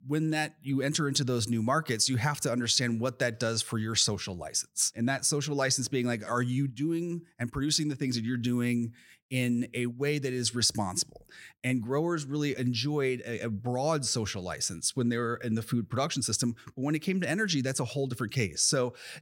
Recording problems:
none

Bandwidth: 16.5 kHz